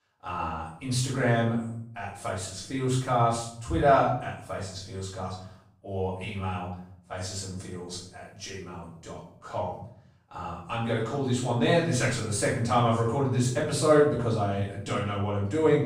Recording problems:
off-mic speech; far
room echo; noticeable; dies away in 0.6 s

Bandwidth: 15.5 kHz